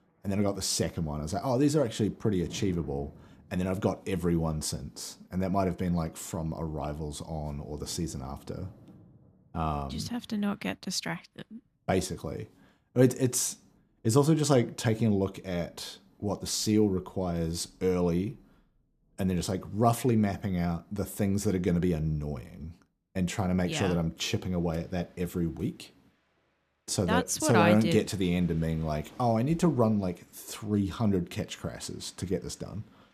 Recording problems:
rain or running water; faint; throughout; 25 dB below the speech

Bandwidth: 14.5 kHz